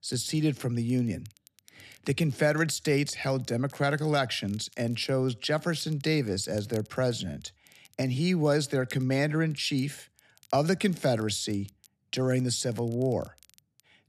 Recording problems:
crackle, like an old record; faint; 25 dB below the speech

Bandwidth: 13.5 kHz